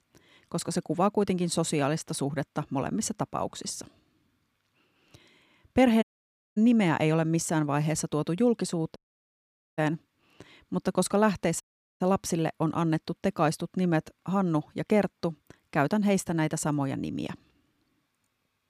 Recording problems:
audio cutting out; at 6 s for 0.5 s, at 9 s for 1 s and at 12 s

